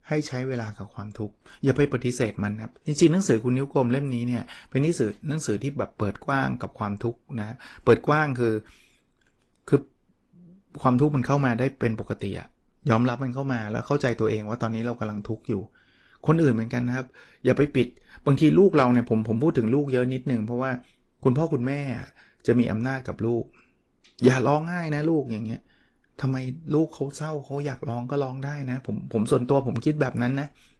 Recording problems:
garbled, watery; slightly

